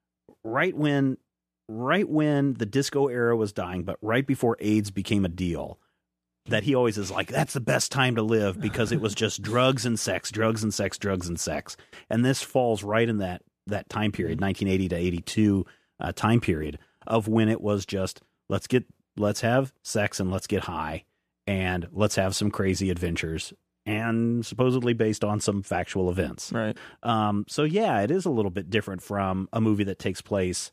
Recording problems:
none

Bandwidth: 14.5 kHz